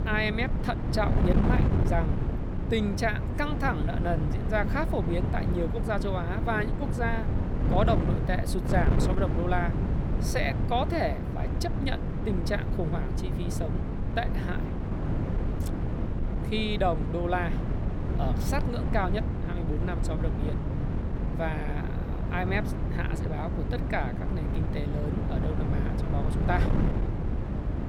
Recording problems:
wind noise on the microphone; heavy; 5 dB below the speech

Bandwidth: 17 kHz